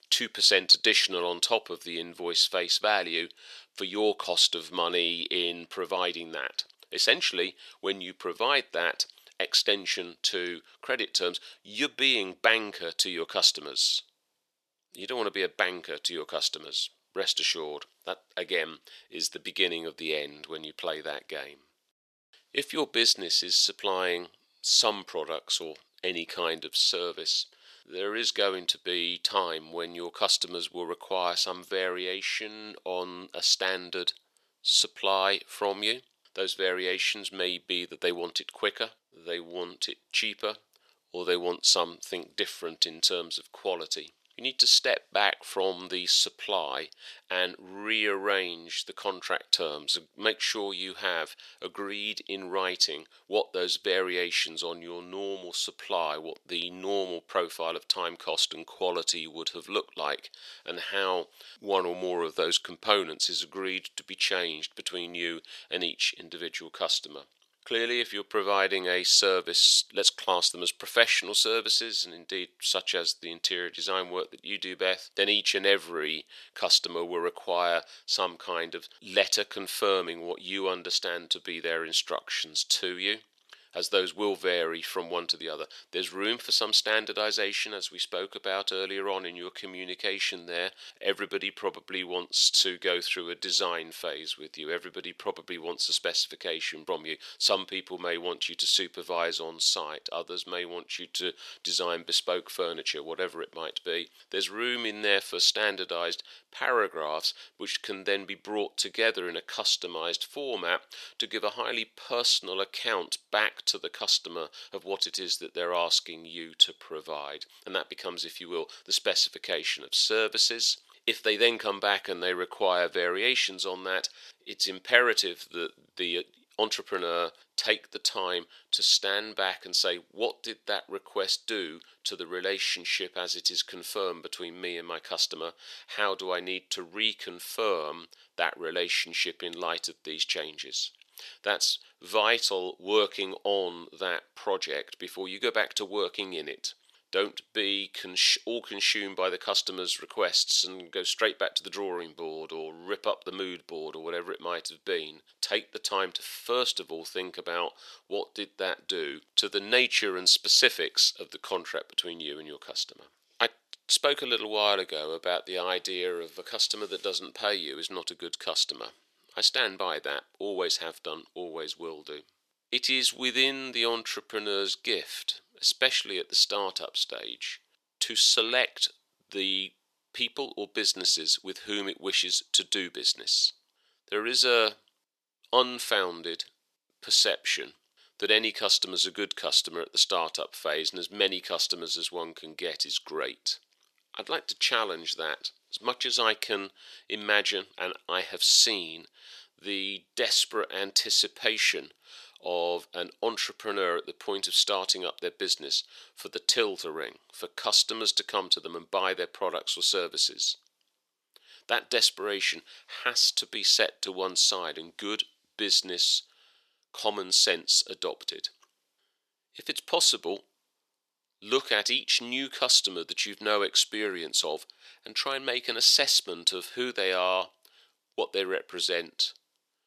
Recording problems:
thin; somewhat; fading below 500 Hz

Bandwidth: 13.5 kHz